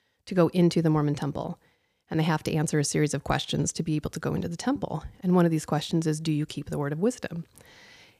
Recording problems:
none

